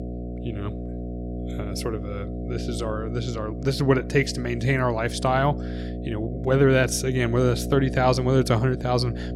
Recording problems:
electrical hum; noticeable; throughout; 60 Hz, 15 dB below the speech

